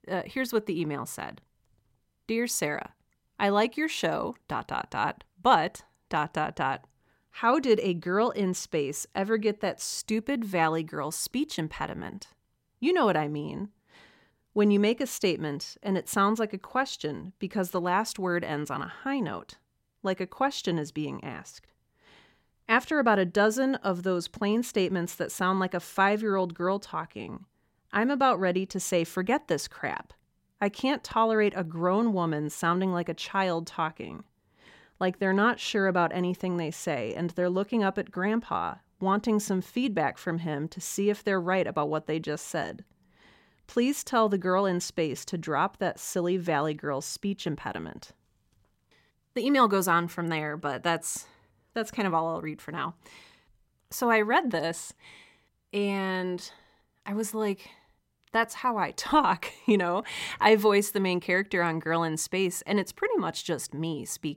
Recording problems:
none

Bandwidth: 16 kHz